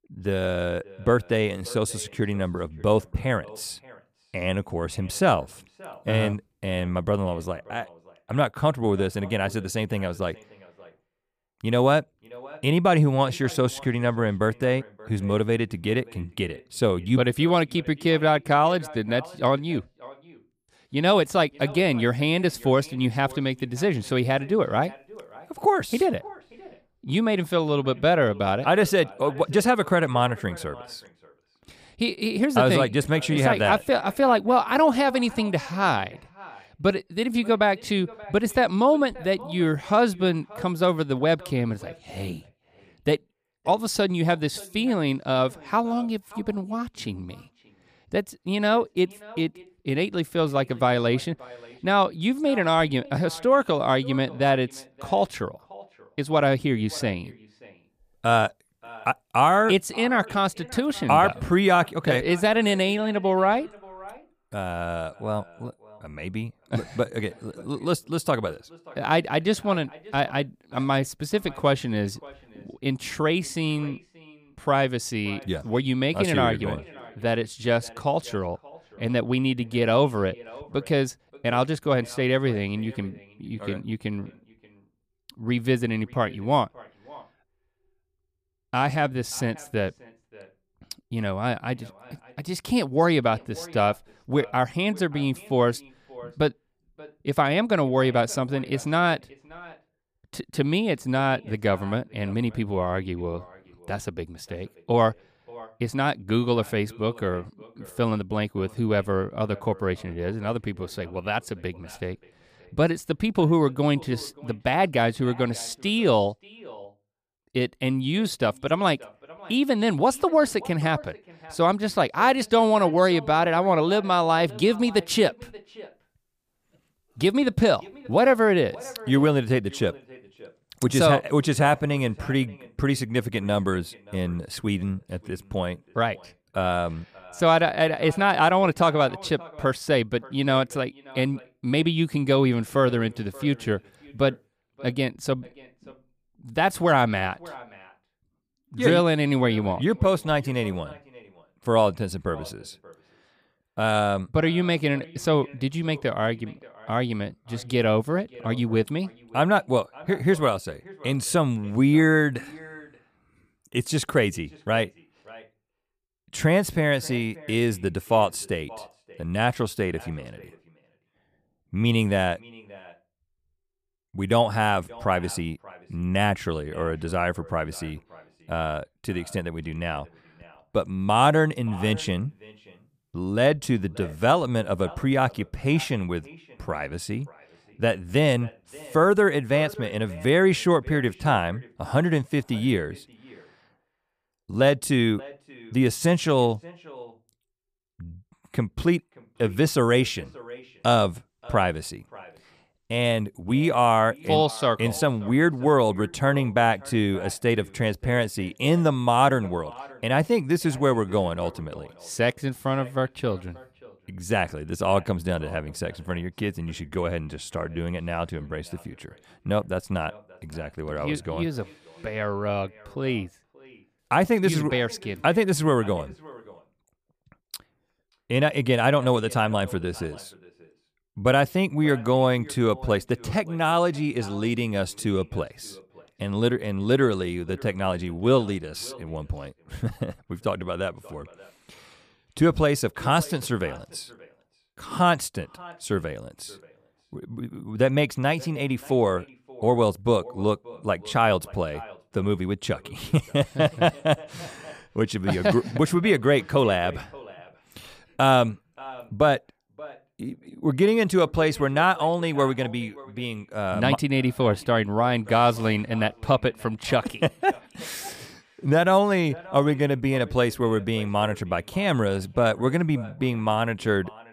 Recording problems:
echo of what is said; faint; throughout; 580 ms later, 20 dB below the speech

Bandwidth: 15 kHz